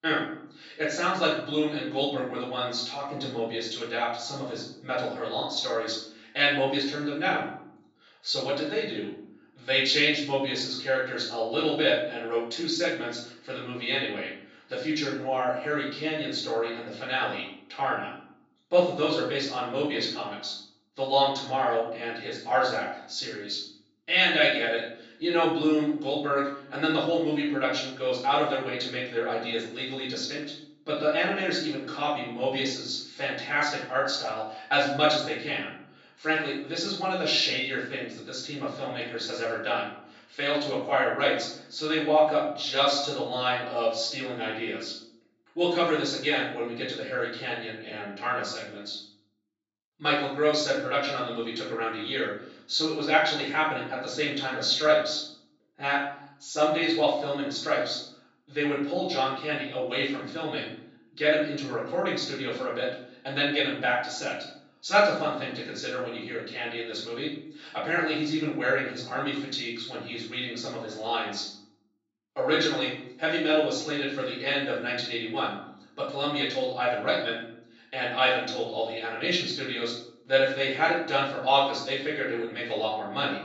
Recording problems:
off-mic speech; far
room echo; noticeable; dies away in 0.6 s
thin; somewhat; fading below 450 Hz
high frequencies cut off; noticeable; nothing above 8 kHz

